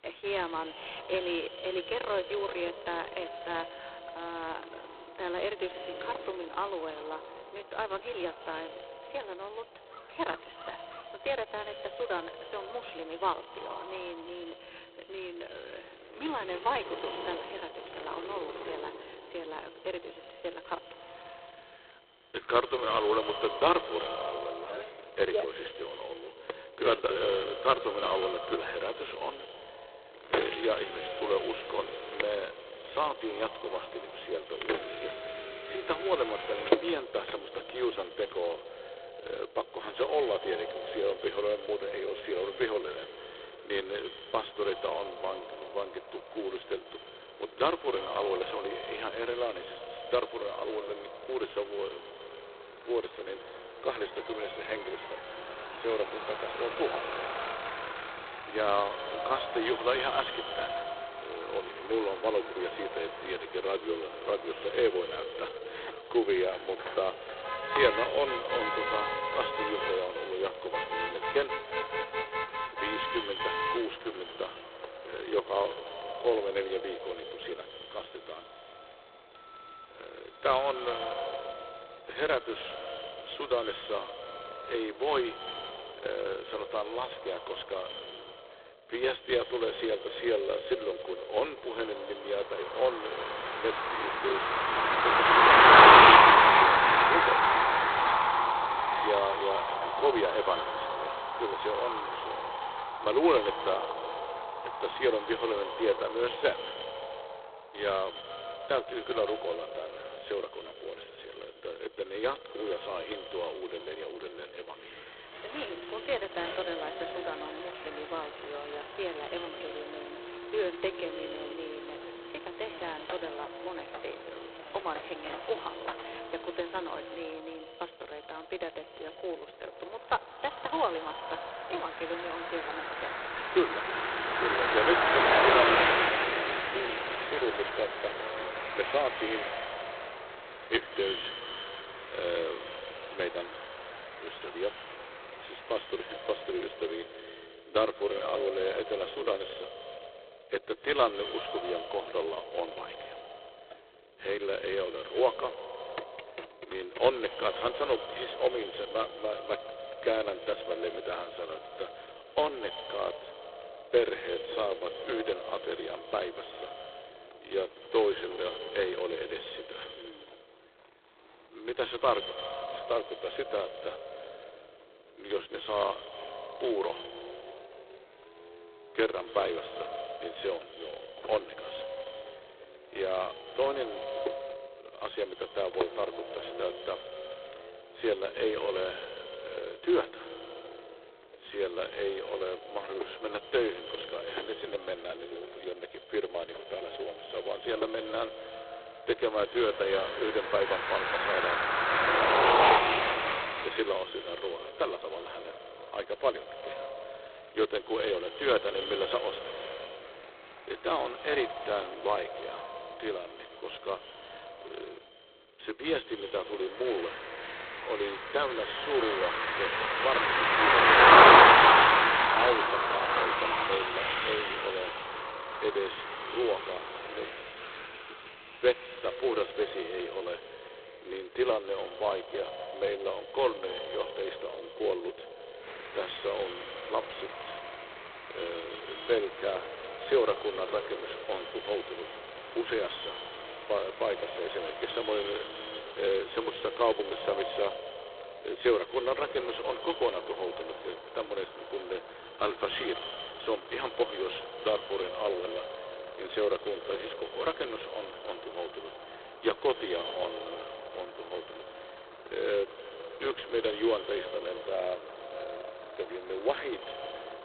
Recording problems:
phone-call audio; poor line; nothing above 4 kHz
echo of what is said; strong; throughout; 90 ms later, 9 dB below the speech
traffic noise; very loud; throughout; 8 dB above the speech

